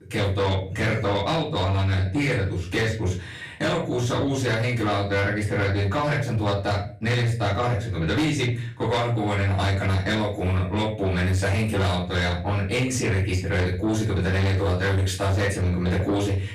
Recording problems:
off-mic speech; far
room echo; slight; dies away in 0.4 s
distortion; slight; 10 dB below the speech

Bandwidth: 14.5 kHz